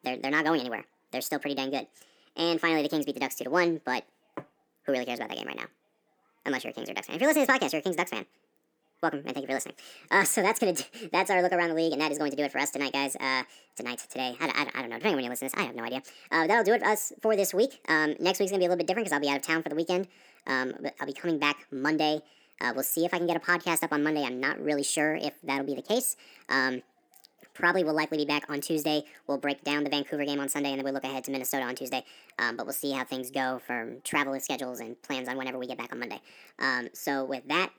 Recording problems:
wrong speed and pitch; too fast and too high; 1.5 times normal speed

